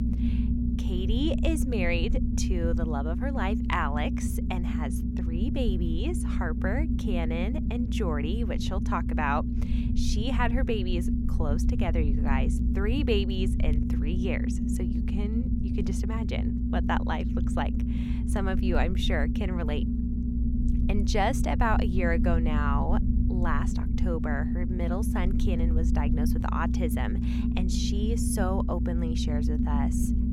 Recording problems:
low rumble; loud; throughout; 4 dB below the speech

